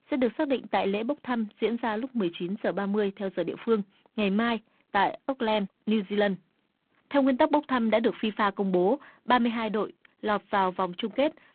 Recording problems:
phone-call audio; poor line

